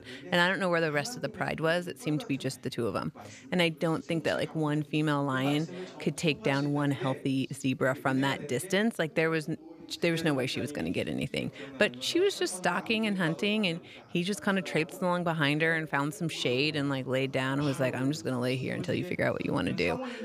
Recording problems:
background chatter; noticeable; throughout; 2 voices, 15 dB below the speech

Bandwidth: 14.5 kHz